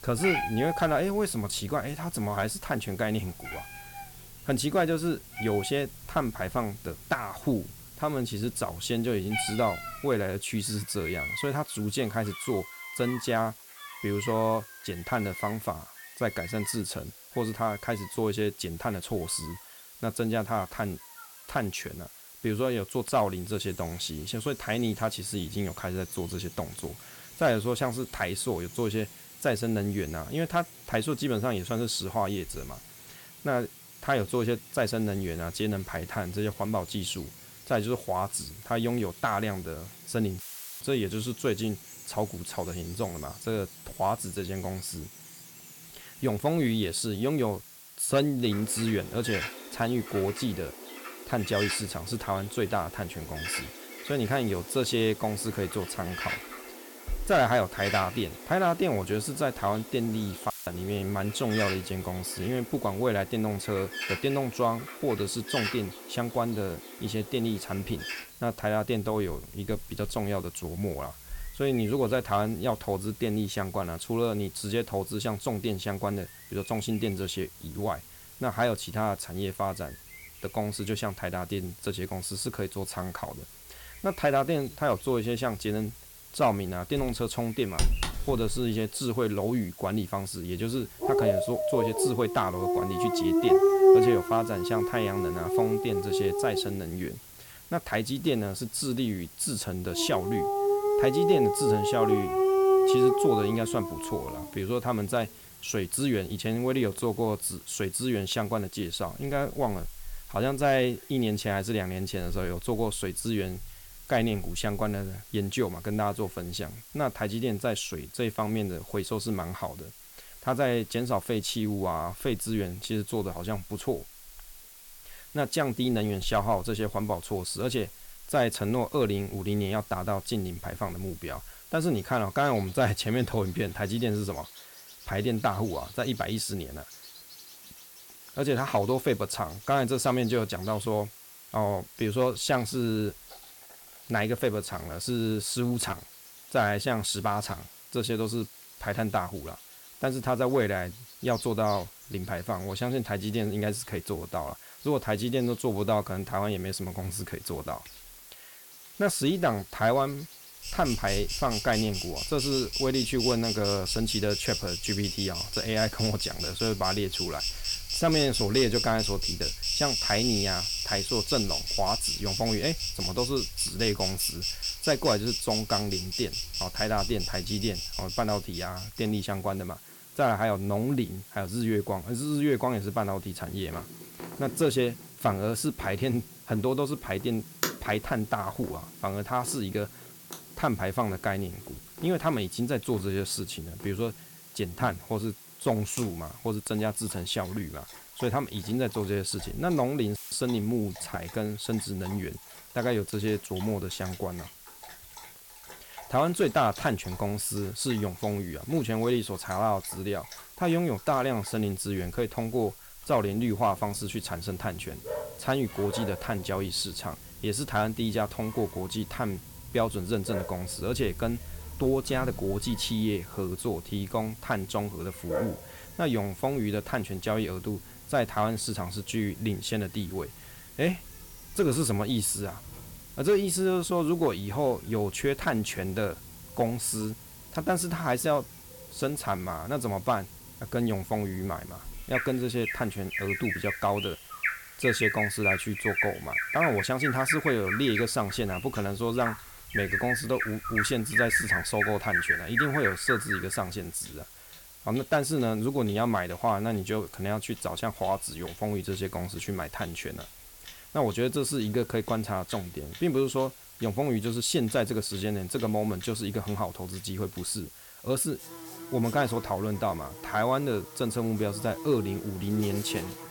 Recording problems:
animal sounds; loud; throughout; 1 dB below the speech
hiss; noticeable; throughout; 15 dB below the speech
audio cutting out; filled with static; at 40 s, at 1:01 and at 3:20

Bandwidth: 17.5 kHz